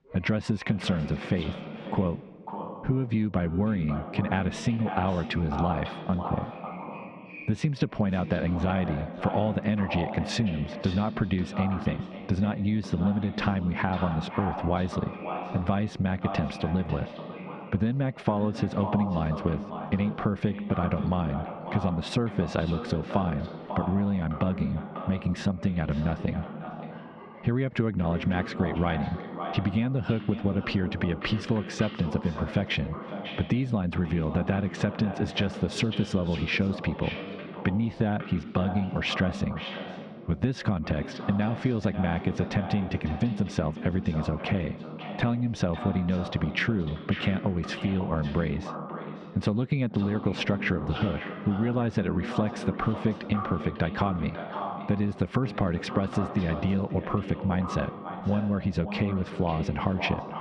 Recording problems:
echo of what is said; strong; throughout; 550 ms later, 9 dB below the speech
squashed, flat; heavily, background pumping
muffled; very slightly; fading above 3.5 kHz
voice in the background; faint; throughout; 20 dB below the speech

